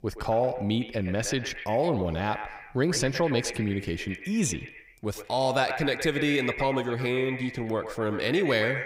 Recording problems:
echo of what is said; strong; throughout; 120 ms later, 8 dB below the speech

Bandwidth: 15.5 kHz